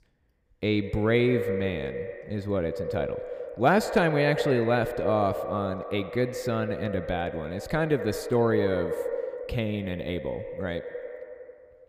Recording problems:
echo of what is said; strong; throughout; 90 ms later, 6 dB below the speech

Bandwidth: 15 kHz